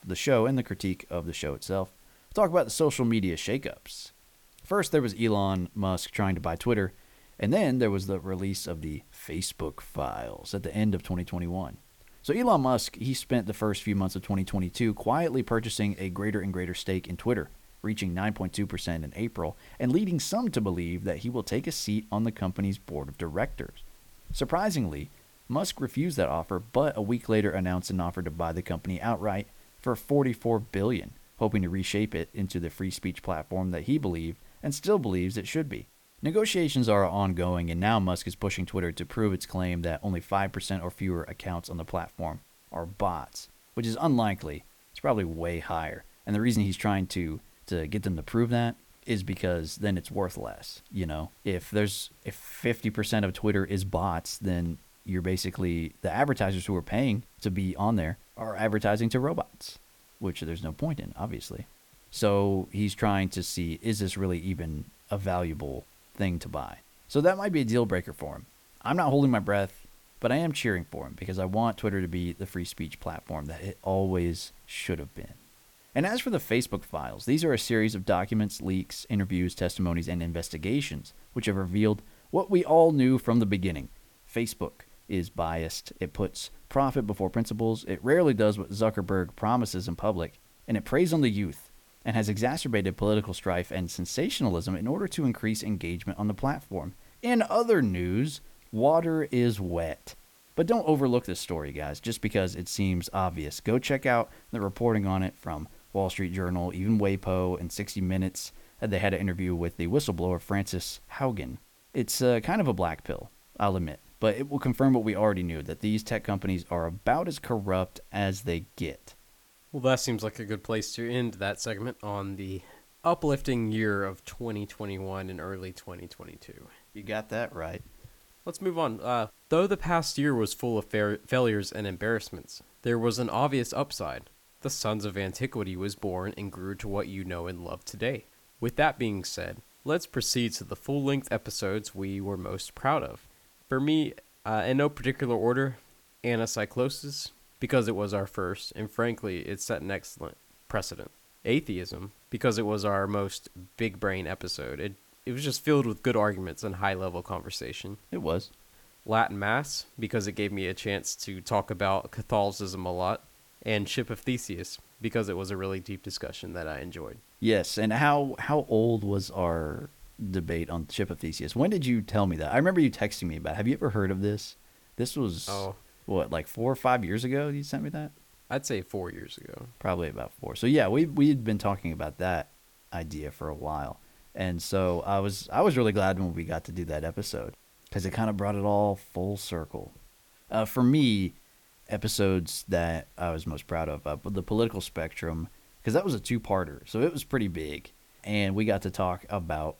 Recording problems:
hiss; faint; throughout; 30 dB below the speech

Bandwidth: 18 kHz